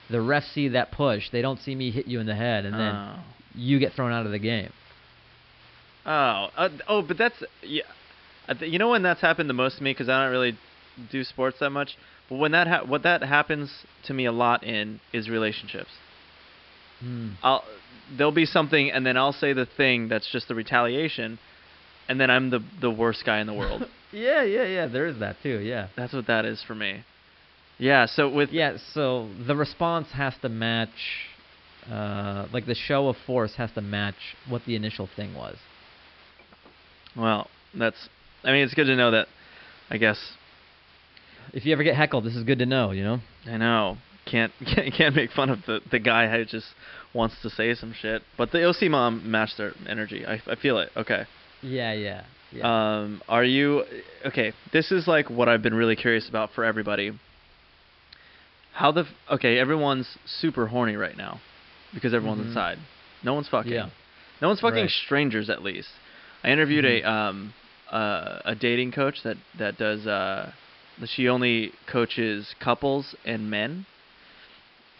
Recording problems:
high frequencies cut off; noticeable; nothing above 5 kHz
hiss; faint; throughout; 25 dB below the speech

